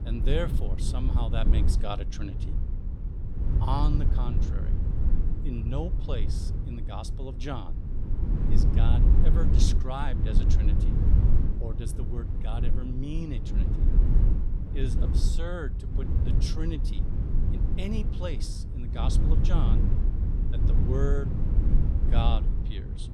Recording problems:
low rumble; loud; throughout; 4 dB below the speech

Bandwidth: 18.5 kHz